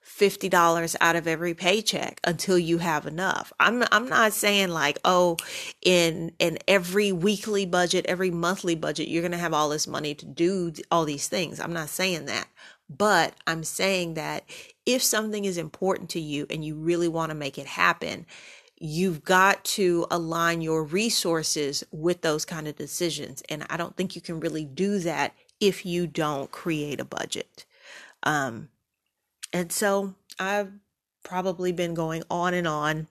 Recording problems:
none

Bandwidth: 13.5 kHz